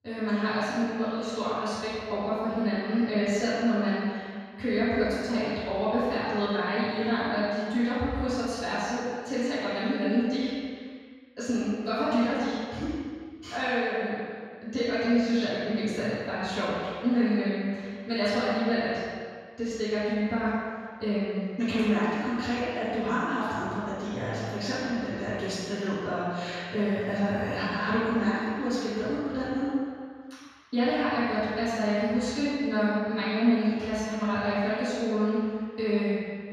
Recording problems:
room echo; strong; dies away in 1.9 s
off-mic speech; far

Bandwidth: 14.5 kHz